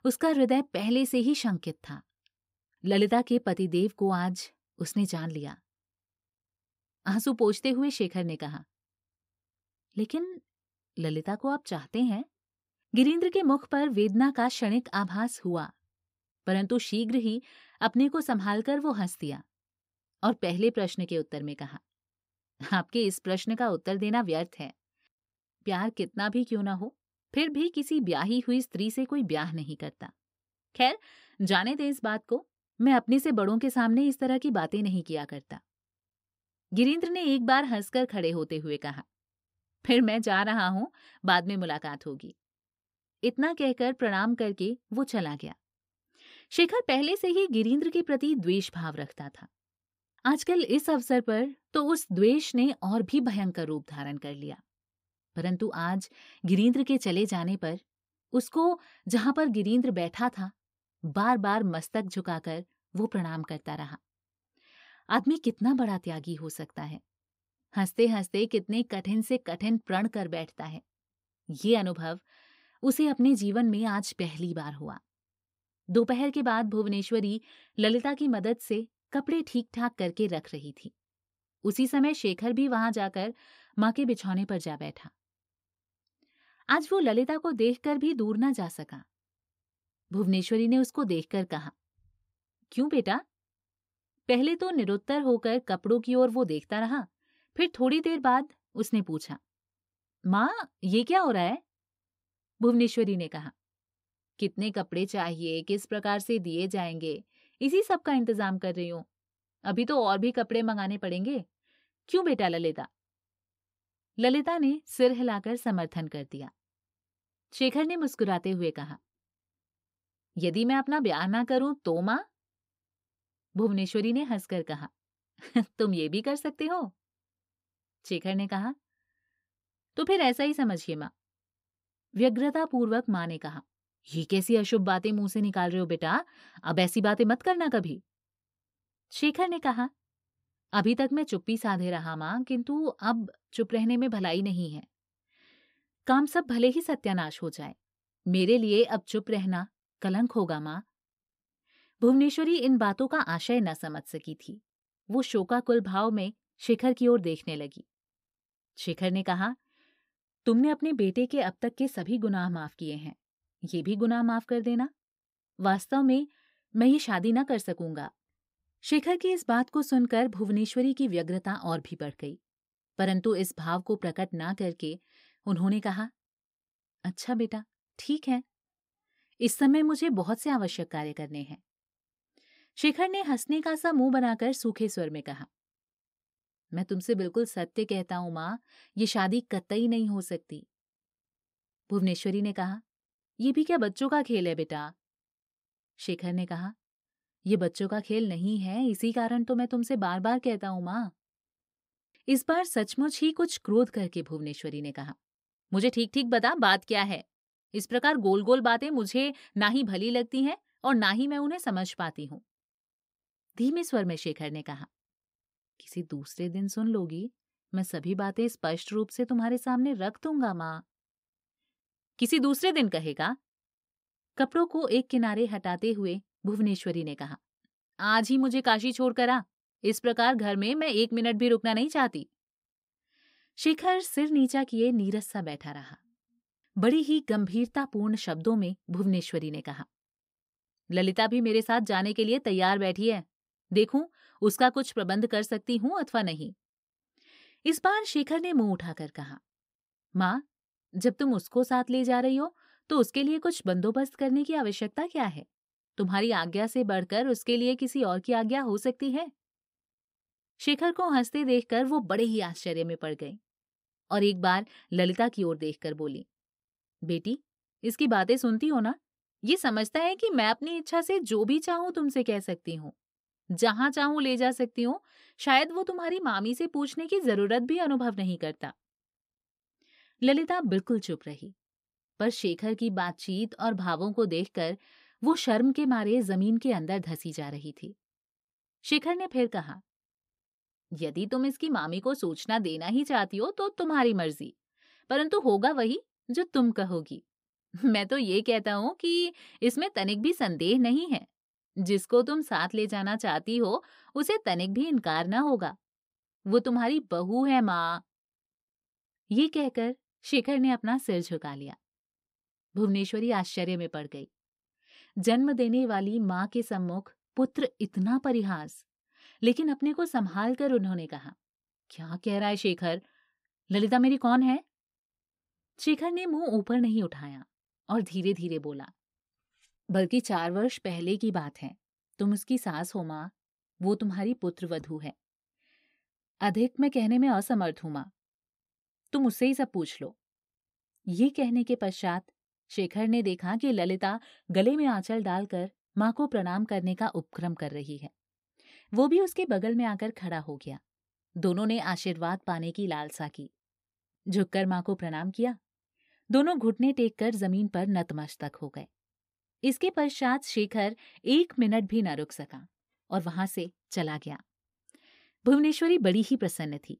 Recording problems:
none

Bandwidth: 15.5 kHz